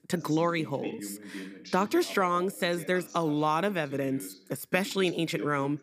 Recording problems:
voice in the background; noticeable; throughout; 15 dB below the speech

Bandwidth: 15 kHz